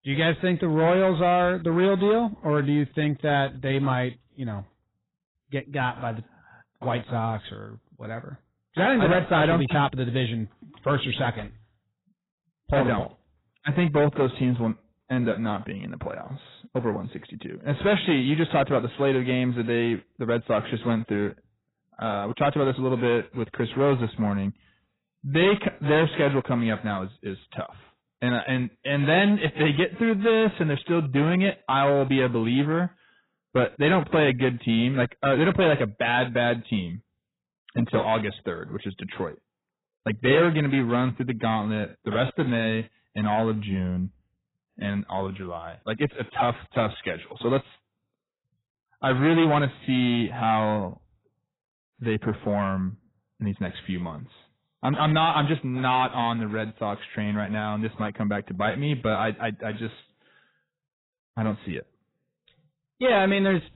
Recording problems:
garbled, watery; badly; nothing above 4 kHz
distortion; slight; 10 dB below the speech

